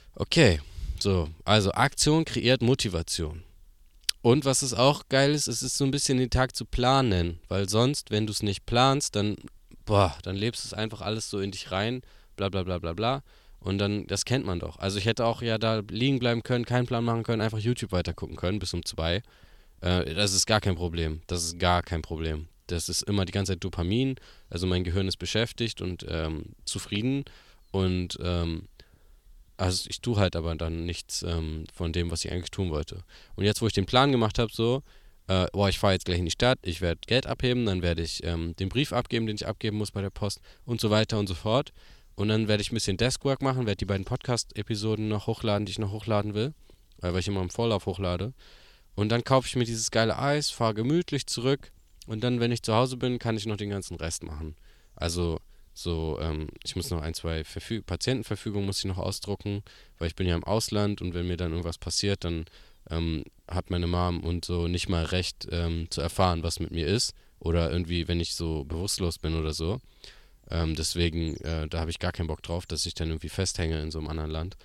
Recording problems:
none

